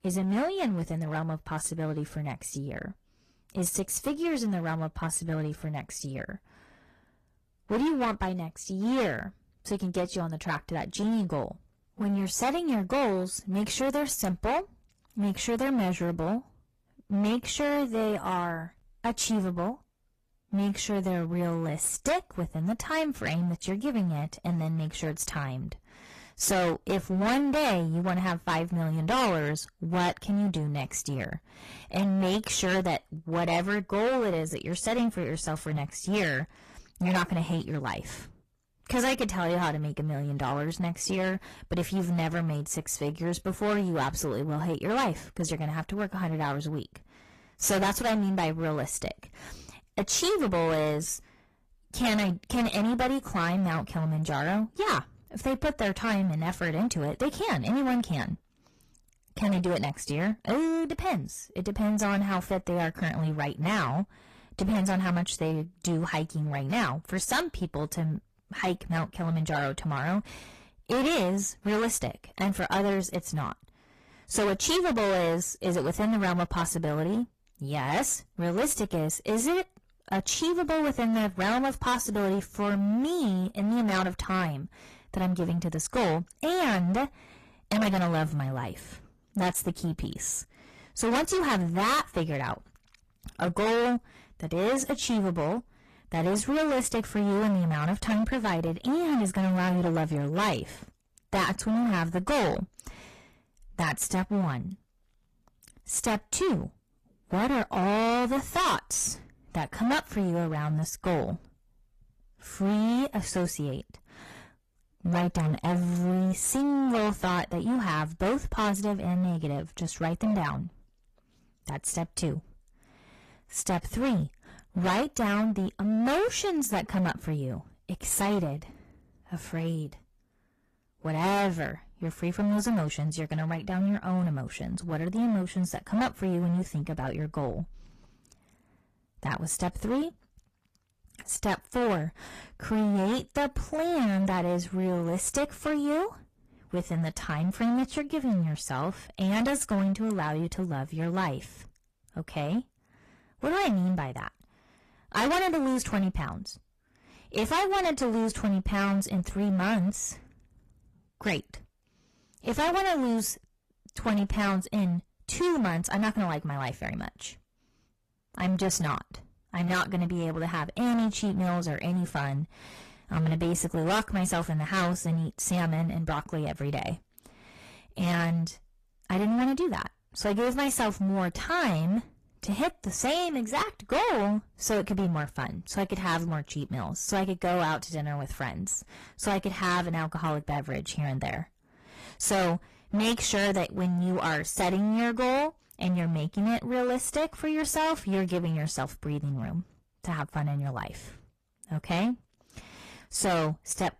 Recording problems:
distortion; heavy; 15% of the sound clipped
garbled, watery; slightly; nothing above 14.5 kHz

